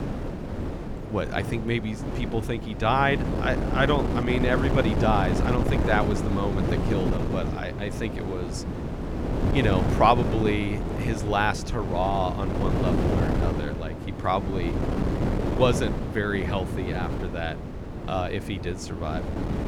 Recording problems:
wind noise on the microphone; heavy; 6 dB below the speech

